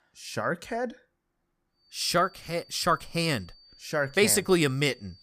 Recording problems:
high-pitched whine; faint; from 2 s on; 4.5 kHz, 25 dB below the speech

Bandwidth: 15 kHz